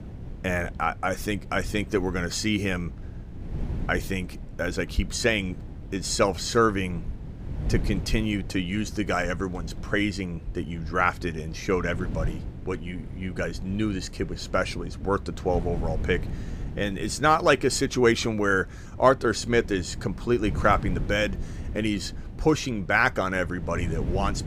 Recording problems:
wind noise on the microphone; occasional gusts; 20 dB below the speech

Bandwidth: 15 kHz